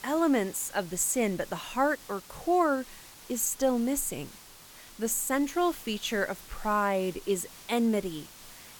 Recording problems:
hiss; noticeable; throughout; 20 dB below the speech

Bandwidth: 18 kHz